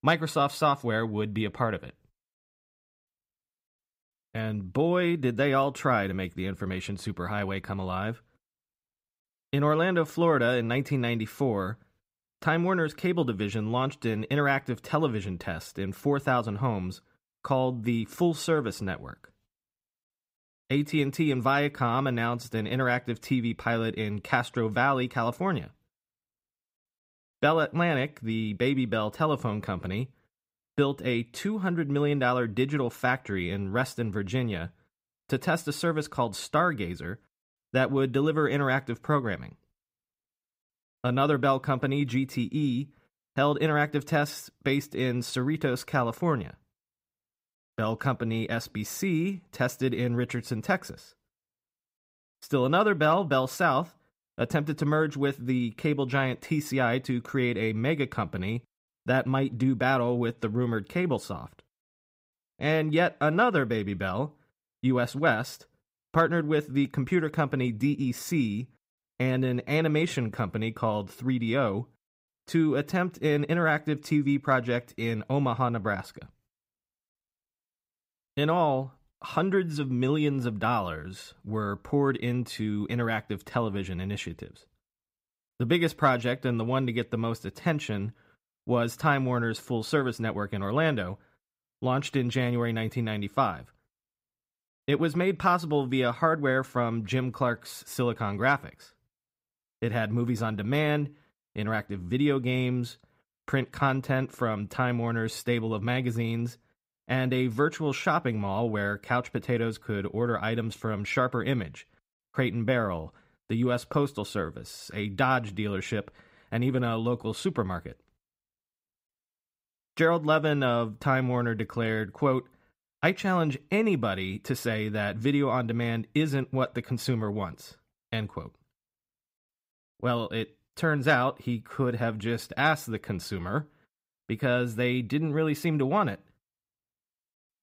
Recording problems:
none

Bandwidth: 15.5 kHz